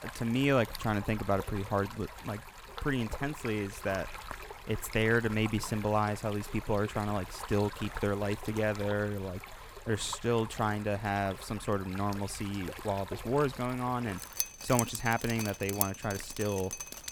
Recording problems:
rain or running water; loud; throughout; 9 dB below the speech

